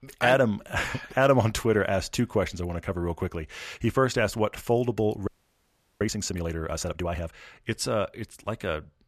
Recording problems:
audio freezing; at 5.5 s for 0.5 s

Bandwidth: 14.5 kHz